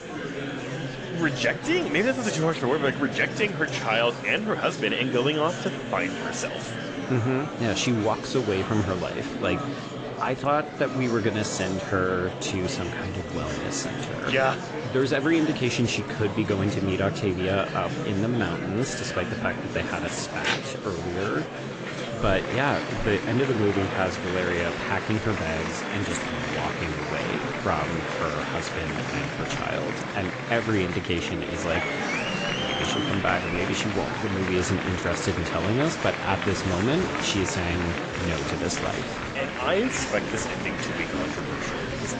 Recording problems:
garbled, watery; slightly; nothing above 7.5 kHz
murmuring crowd; loud; throughout; 4 dB below the speech
animal sounds; noticeable; throughout; 20 dB below the speech

